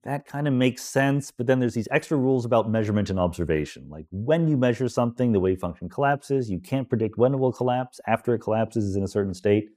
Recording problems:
none

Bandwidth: 15 kHz